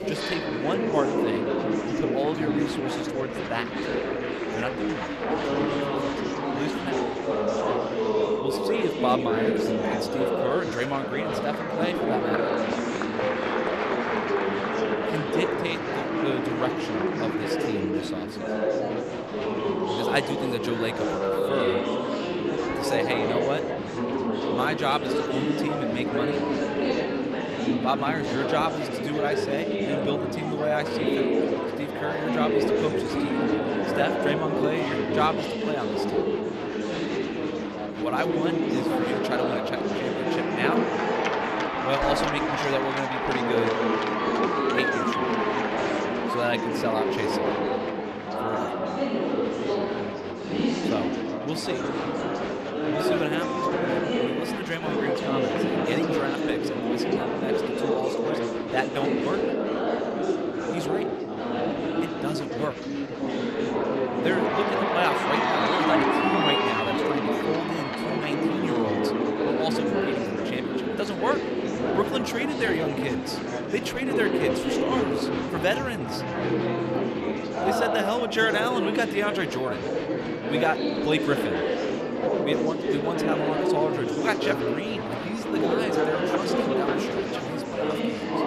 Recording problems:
chatter from many people; very loud; throughout; 4 dB above the speech

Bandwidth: 15 kHz